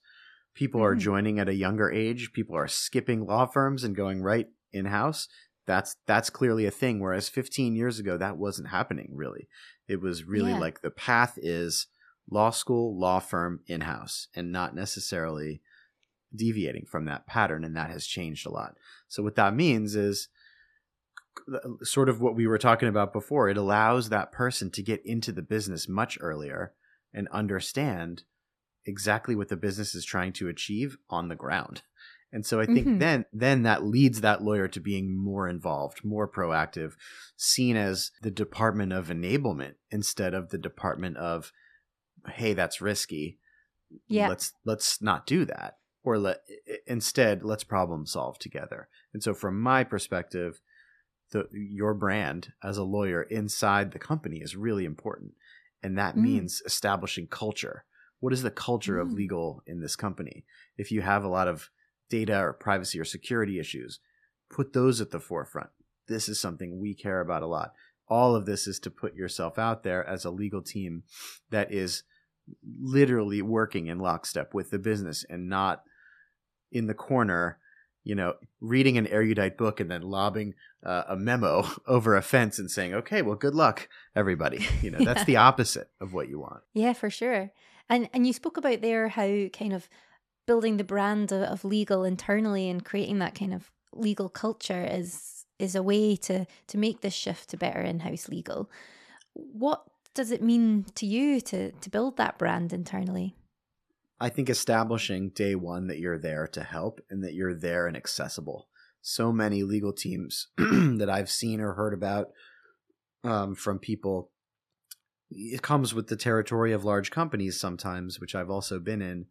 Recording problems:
none

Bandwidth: 14 kHz